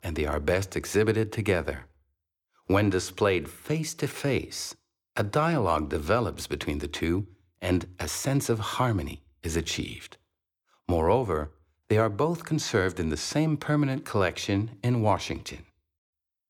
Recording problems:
none

